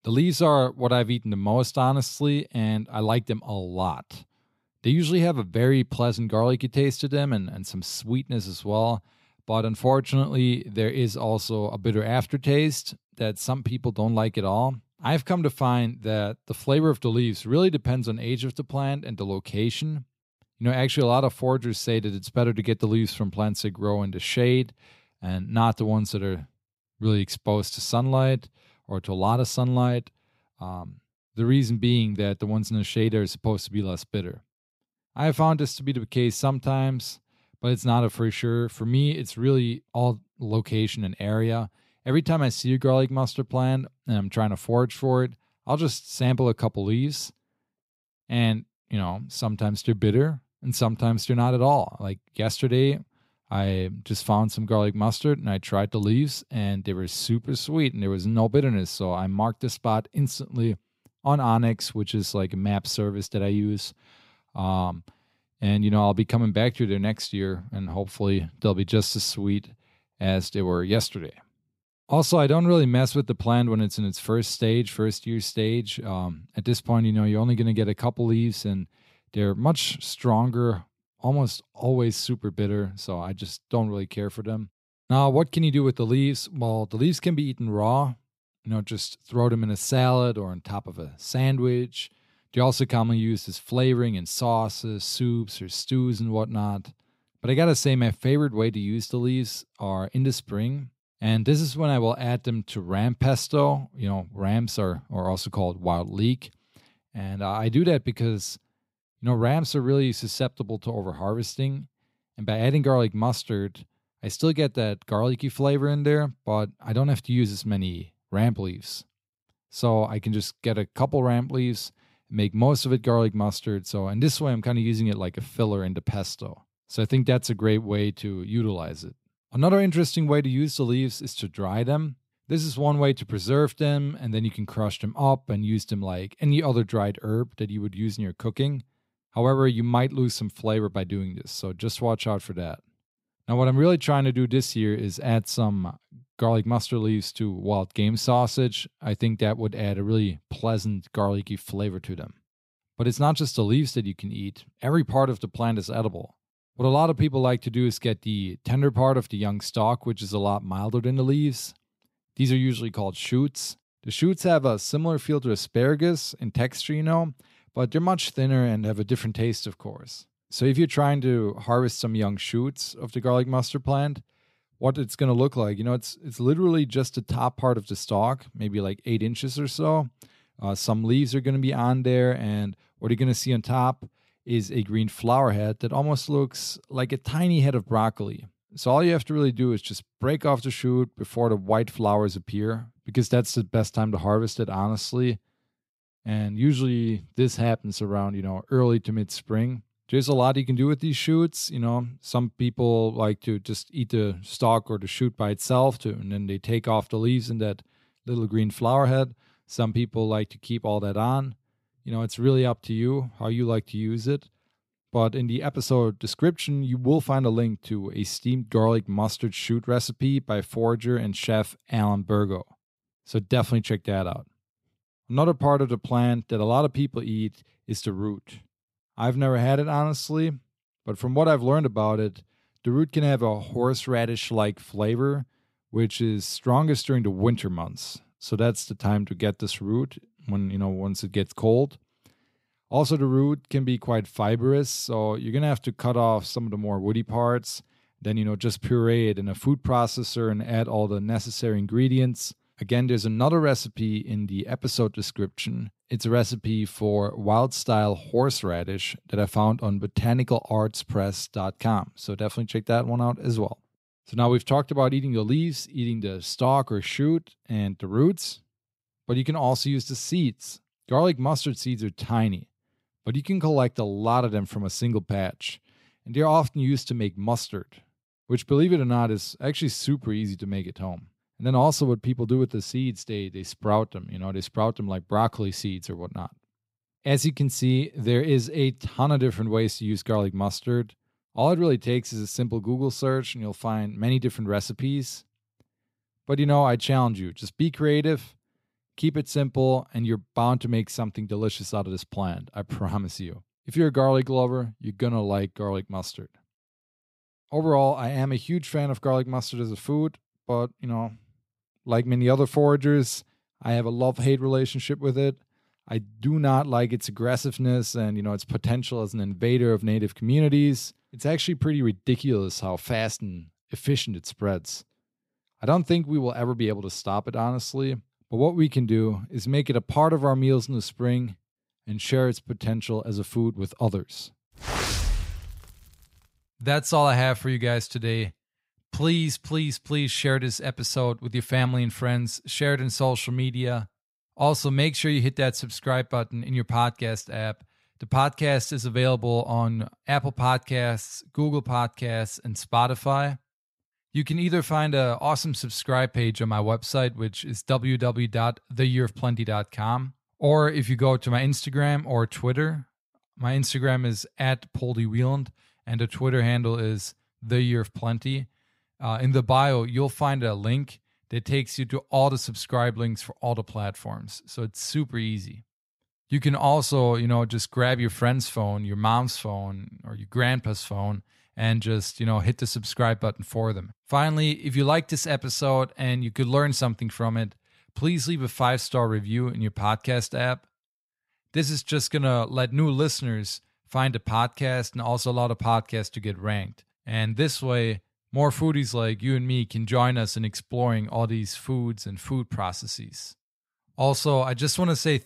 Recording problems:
none

